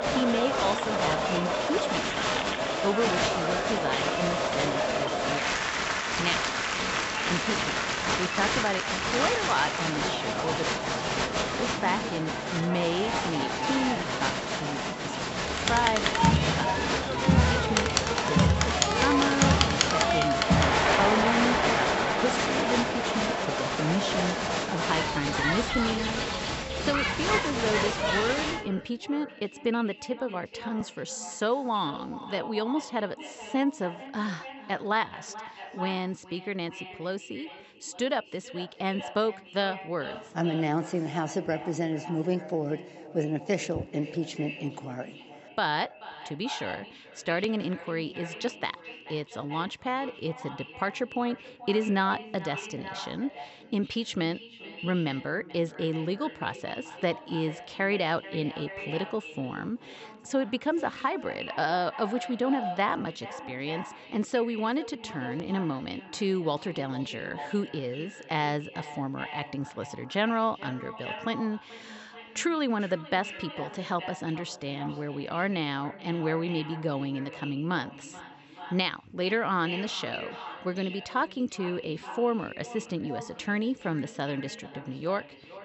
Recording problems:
echo of what is said; strong; throughout; 430 ms later, 10 dB below the speech
high frequencies cut off; noticeable; nothing above 8 kHz
crowd noise; very loud; until 29 s; 5 dB above the speech

